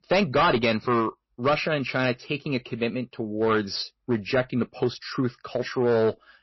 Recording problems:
distortion; slight; 6% of the sound clipped
garbled, watery; slightly; nothing above 5.5 kHz

